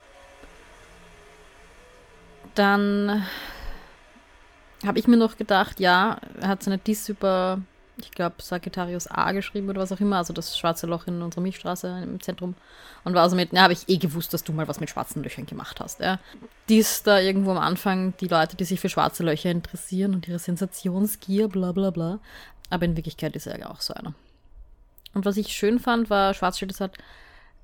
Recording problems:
wind in the background; faint; throughout; 30 dB below the speech

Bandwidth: 17.5 kHz